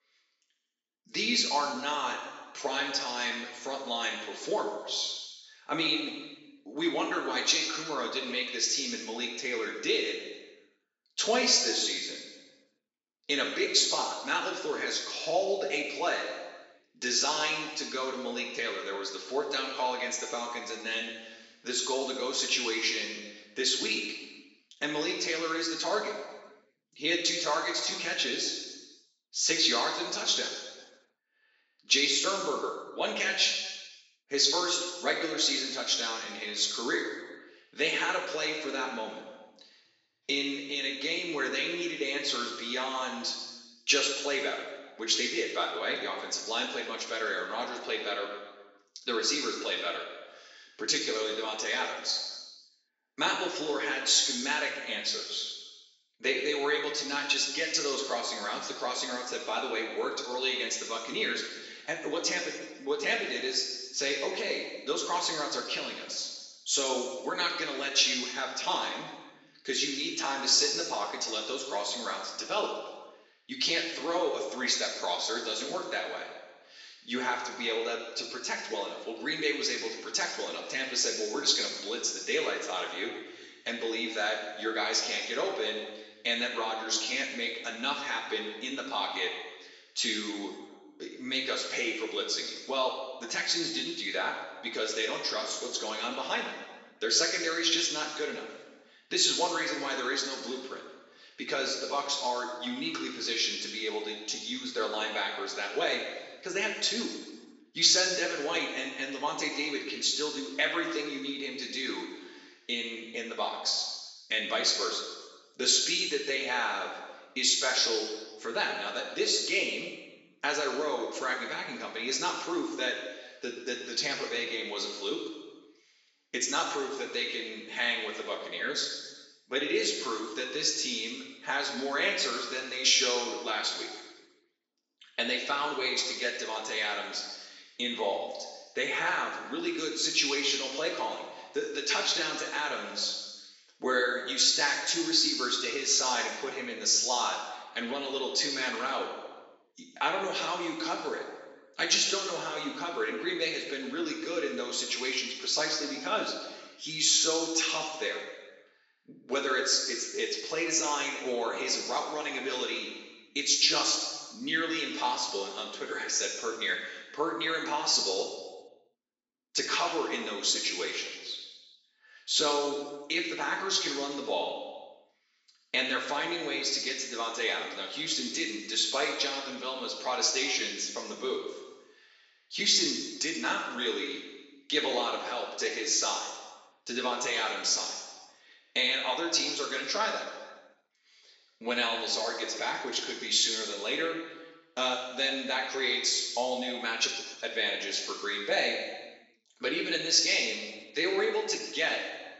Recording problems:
off-mic speech; far
room echo; noticeable; dies away in 1.2 s
thin; somewhat; fading below 300 Hz
high frequencies cut off; noticeable; nothing above 8 kHz

